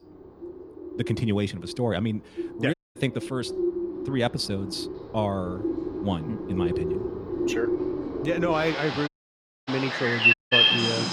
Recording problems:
animal sounds; very loud; throughout; 3 dB above the speech
audio cutting out; at 2.5 s, at 9 s for 0.5 s and at 10 s

